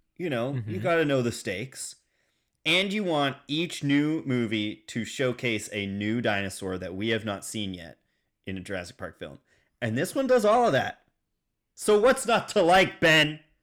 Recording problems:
distortion; slight; 10 dB below the speech

